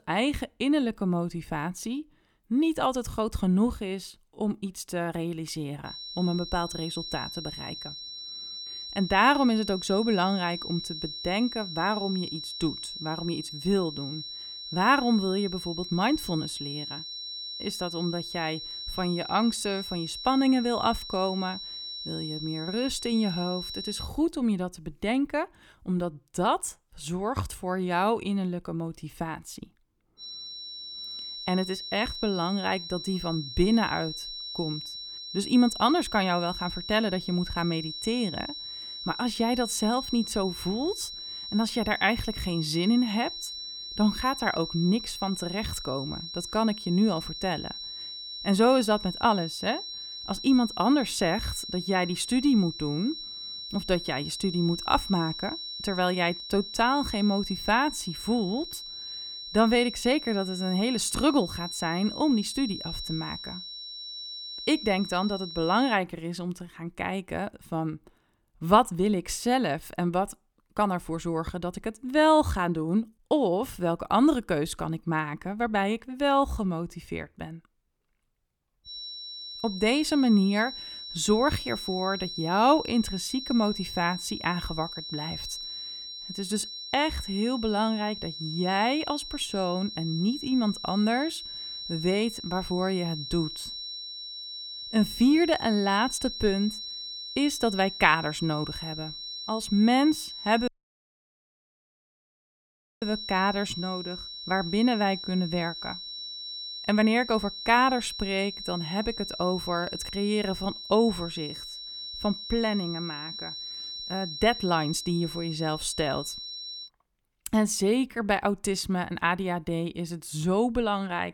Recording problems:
high-pitched whine; loud; from 6 to 24 s, from 30 s to 1:06 and from 1:19 to 1:57; 4 kHz, 8 dB below the speech
audio cutting out; at 1:41 for 2.5 s

